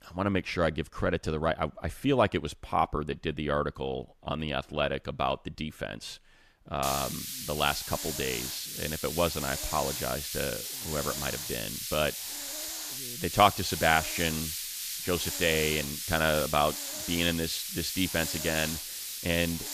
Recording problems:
hiss; loud; from 7 s on; 4 dB below the speech

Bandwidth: 14.5 kHz